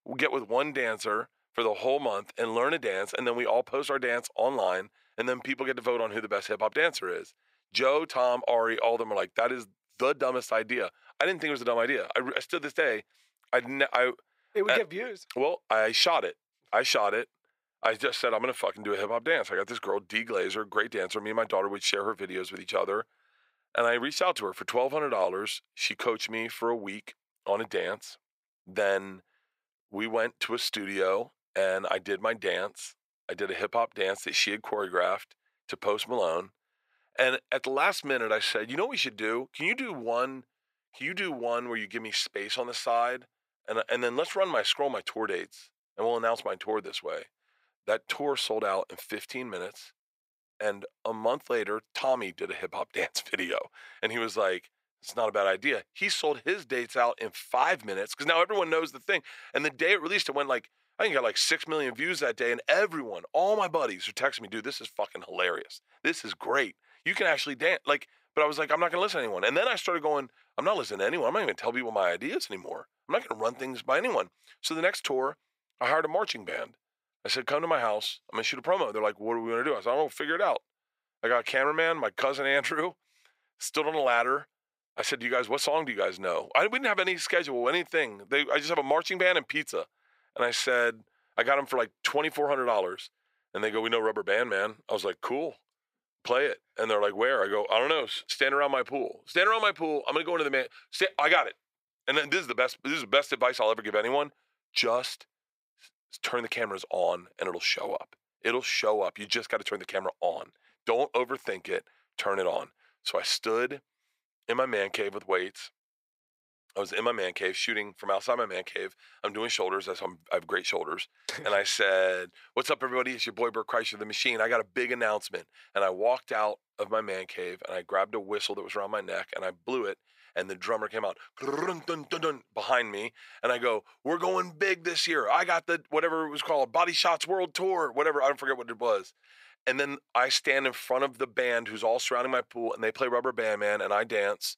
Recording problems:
thin; very; fading below 550 Hz

